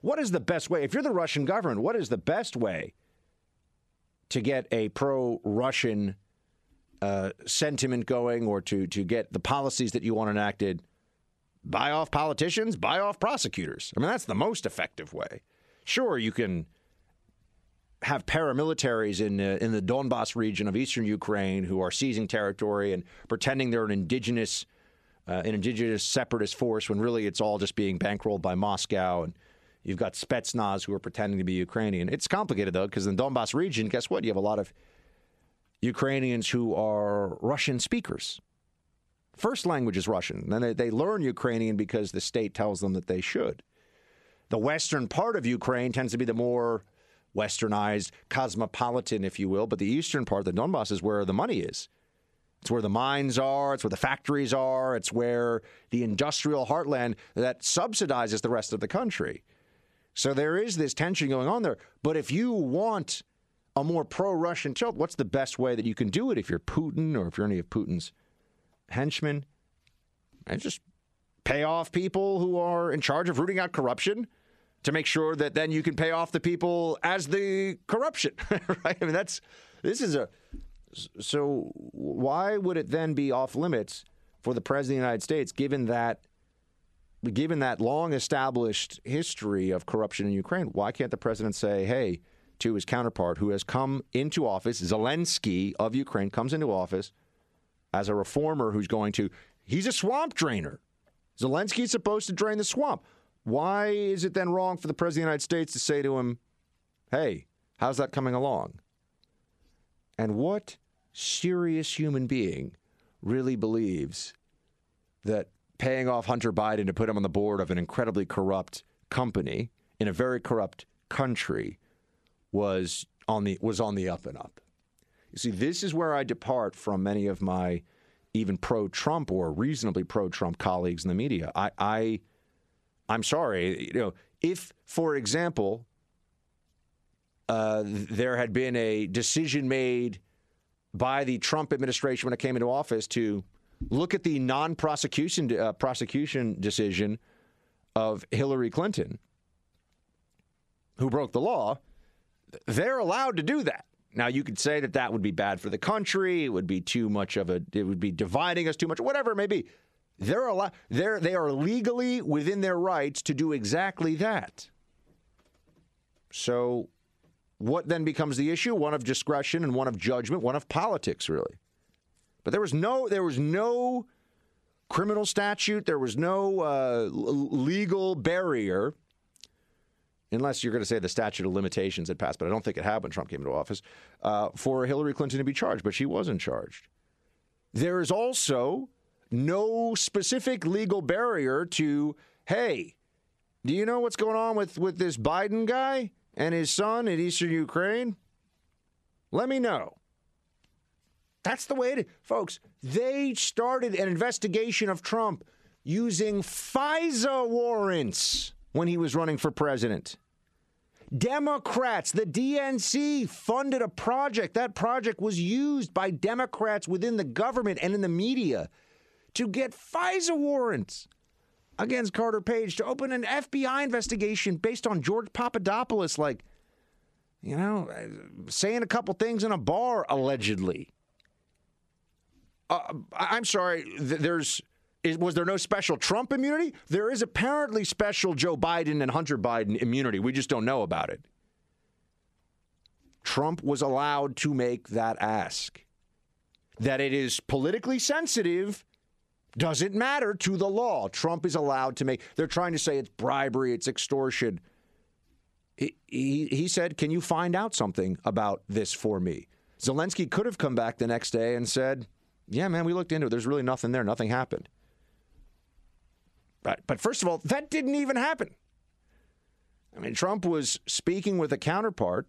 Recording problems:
squashed, flat; heavily

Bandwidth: 13 kHz